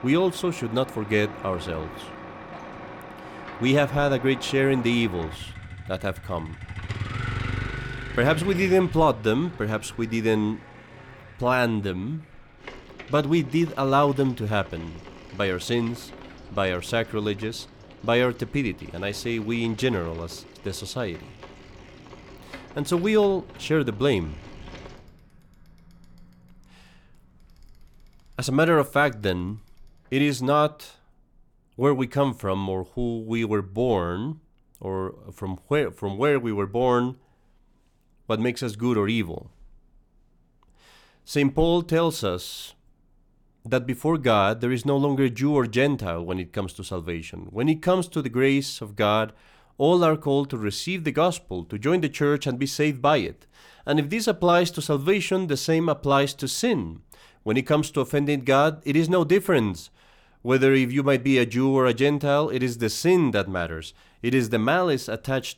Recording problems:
traffic noise; noticeable; until 31 s; 15 dB below the speech

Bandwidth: 19 kHz